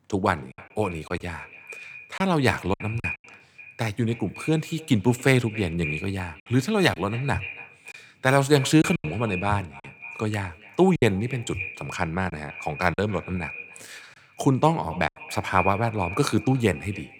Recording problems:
echo of what is said; noticeable; throughout; 280 ms later, 15 dB below the speech
choppy; occasionally; 4% of the speech affected

